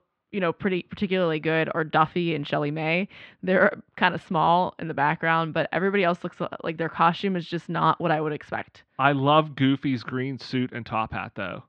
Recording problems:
muffled; slightly; fading above 3.5 kHz

